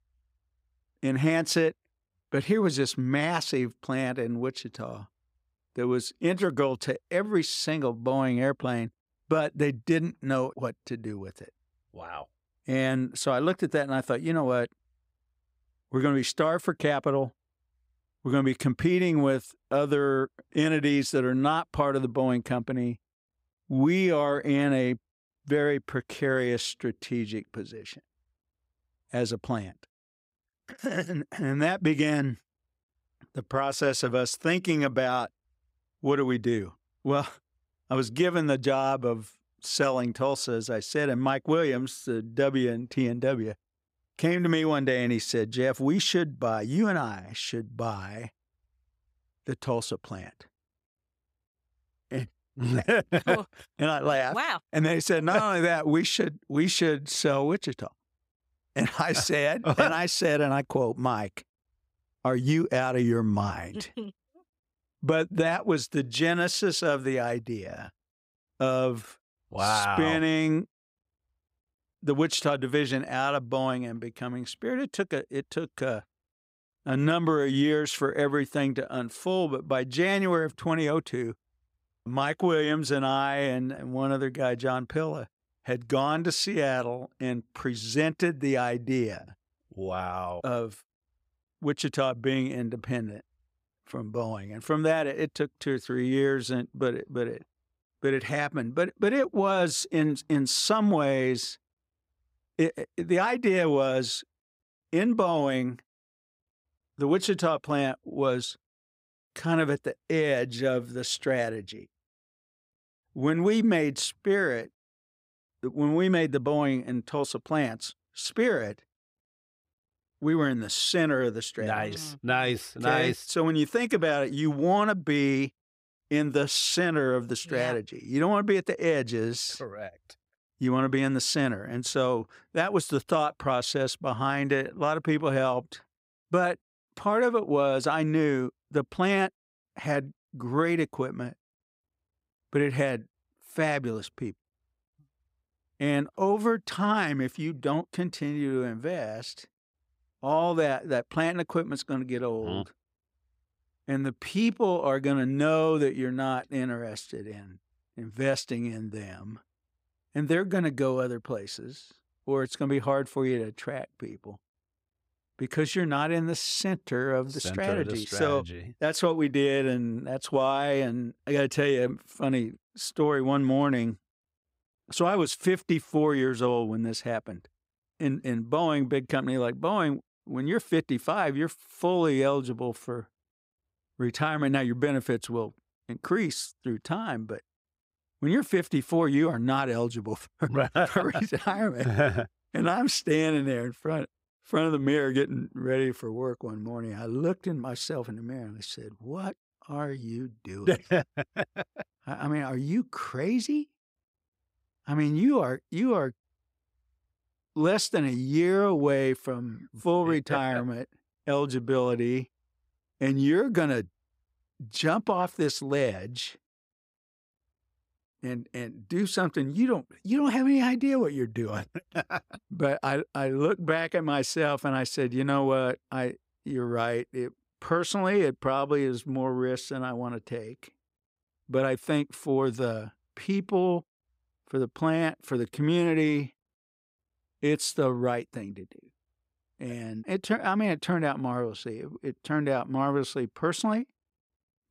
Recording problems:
none

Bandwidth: 15.5 kHz